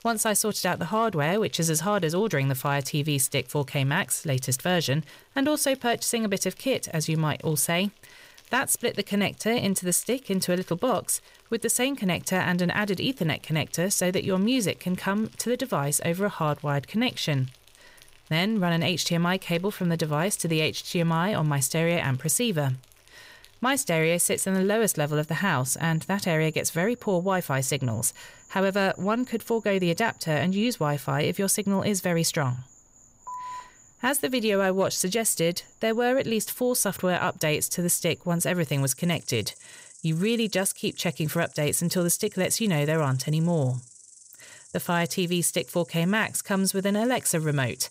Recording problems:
animal sounds; faint; throughout; 25 dB below the speech
phone ringing; faint; at 33 s; peak 10 dB below the speech

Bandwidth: 15.5 kHz